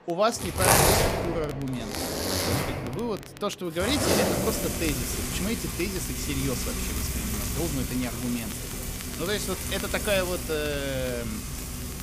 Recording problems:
household noises; very loud; throughout; 2 dB above the speech
murmuring crowd; noticeable; throughout; 20 dB below the speech
crackle, like an old record; noticeable; 15 dB below the speech

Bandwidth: 15 kHz